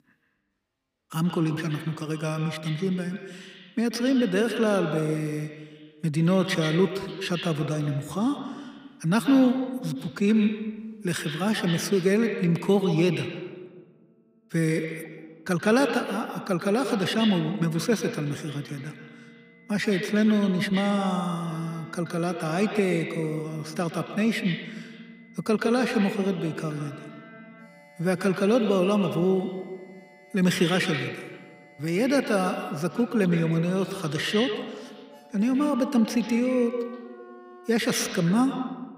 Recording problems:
echo of what is said; strong; throughout; 130 ms later, 8 dB below the speech
high-pitched whine; faint; from 17 to 33 s; 2 kHz, 30 dB below the speech
background music; faint; throughout; 25 dB below the speech

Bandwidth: 15.5 kHz